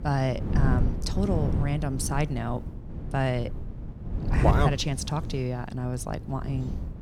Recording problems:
wind noise on the microphone; heavy; 9 dB below the speech

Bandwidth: 18 kHz